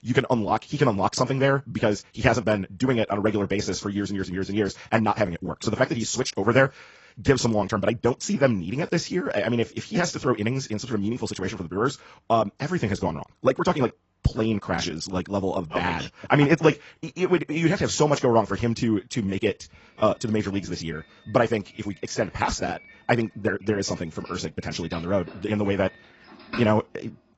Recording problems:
garbled, watery; badly; nothing above 7.5 kHz
wrong speed, natural pitch; too fast; 1.6 times normal speed
doorbell; faint; from 21 to 27 s; peak 10 dB below the speech

